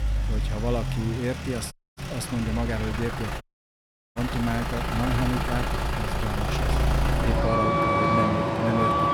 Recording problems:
traffic noise; very loud; throughout; 4 dB above the speech
audio cutting out; at 1.5 s and at 3.5 s for 0.5 s

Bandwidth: 18.5 kHz